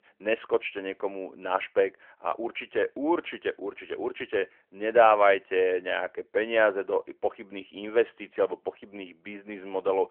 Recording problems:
phone-call audio; nothing above 3 kHz

